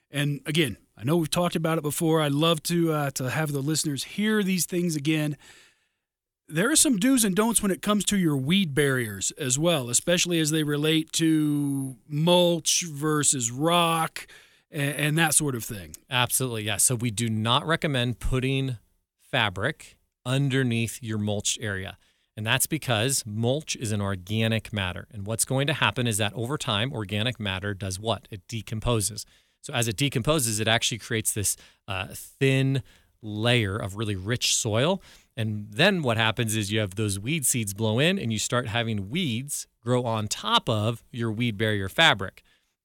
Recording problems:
none

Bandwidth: 18.5 kHz